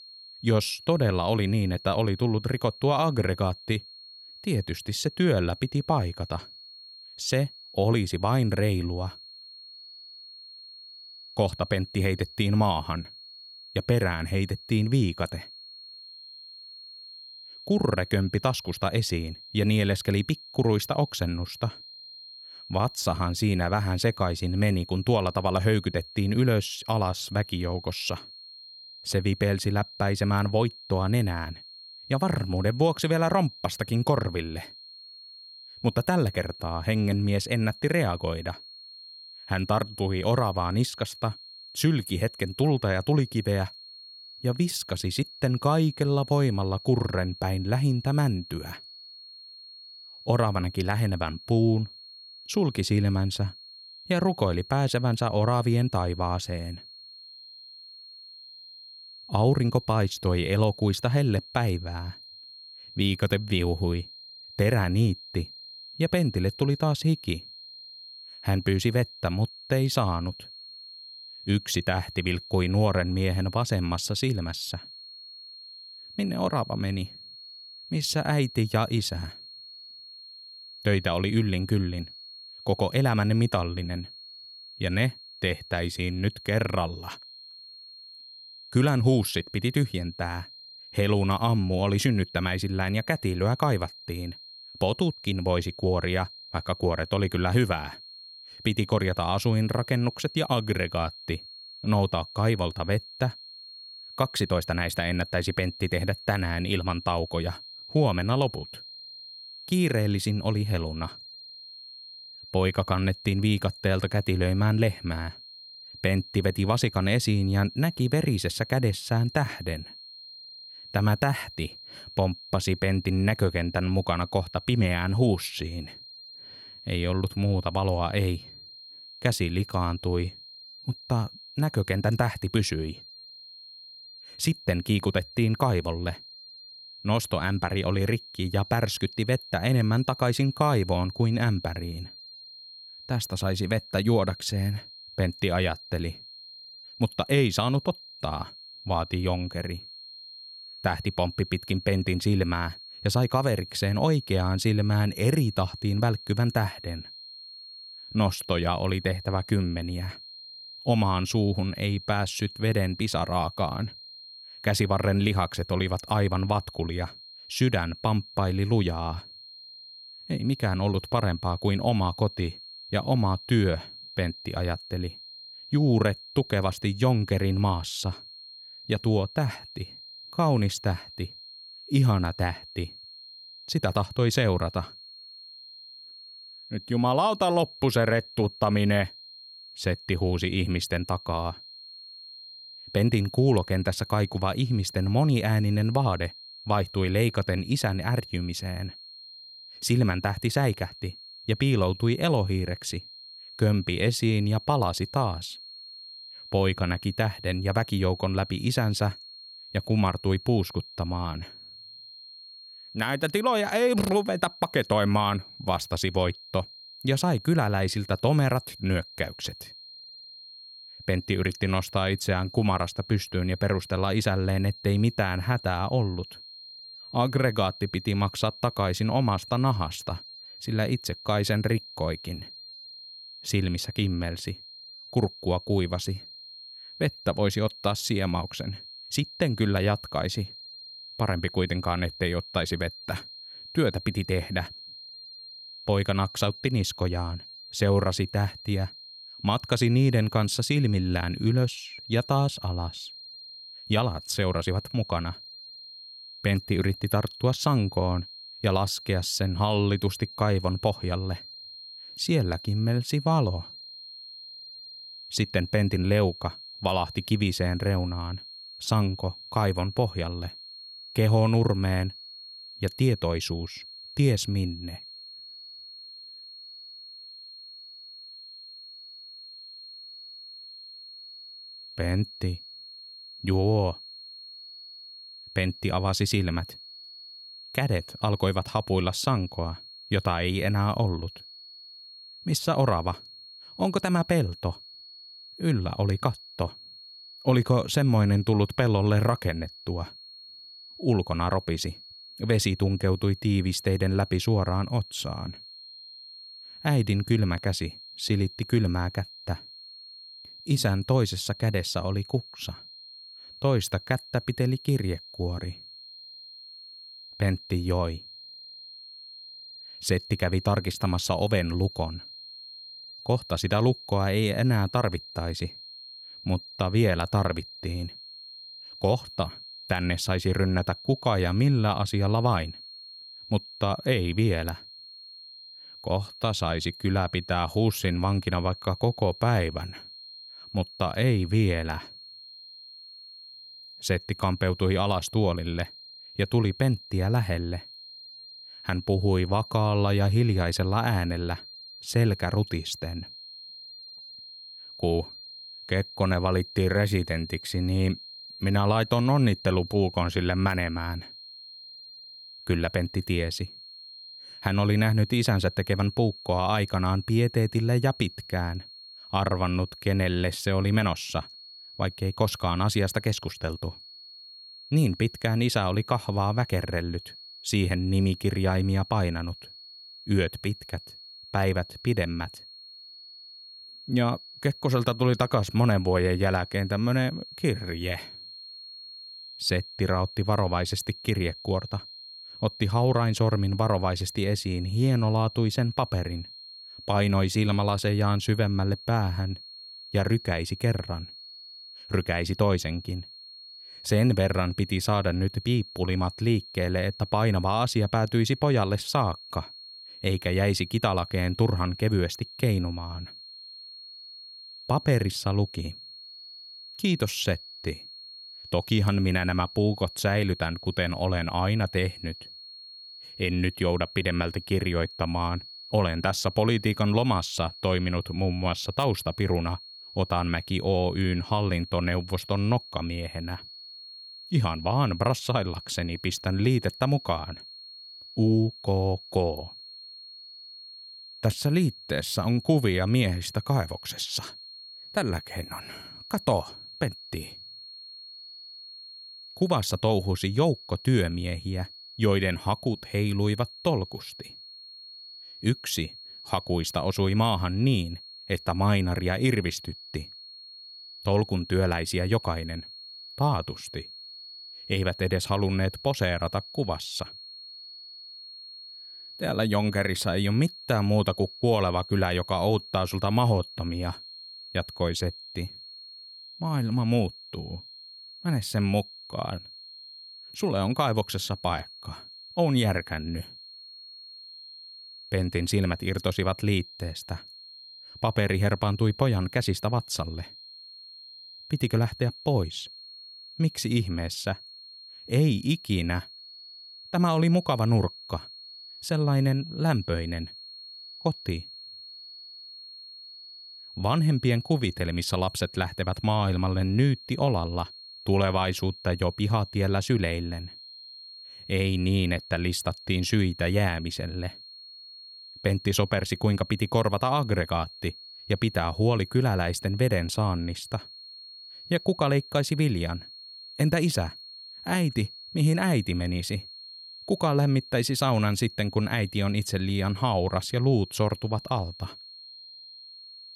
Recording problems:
high-pitched whine; noticeable; throughout; 4 kHz, 15 dB below the speech

